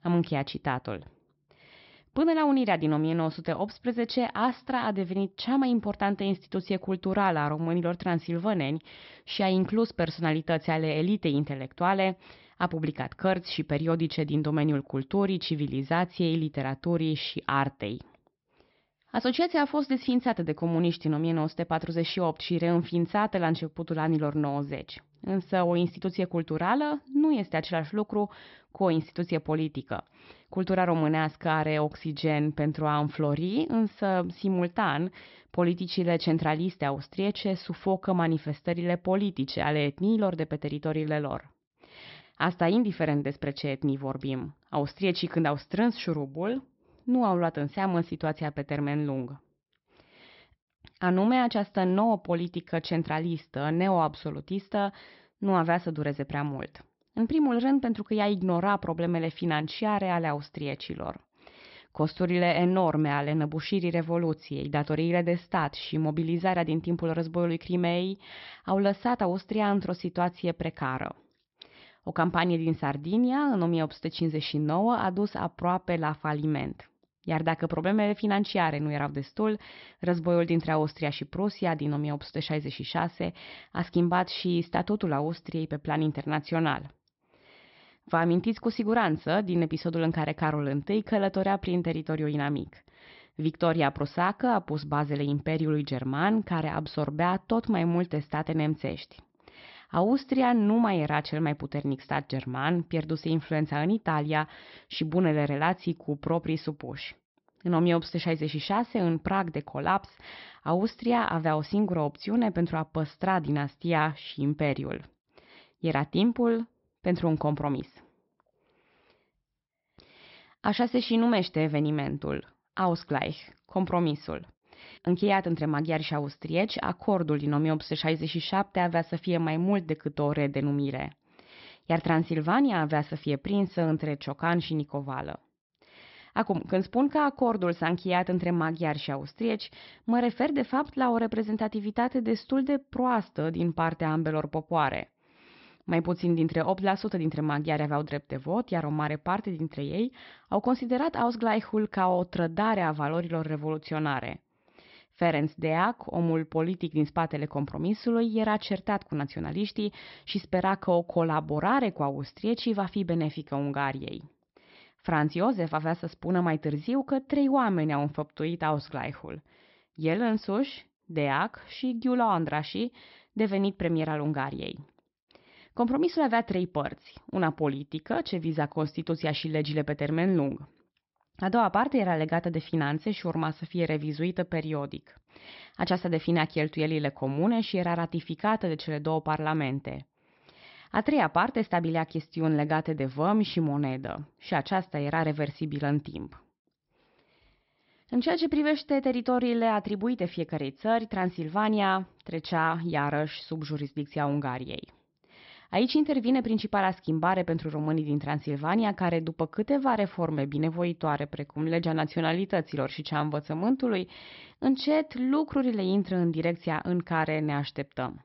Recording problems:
high frequencies cut off; noticeable; nothing above 5.5 kHz

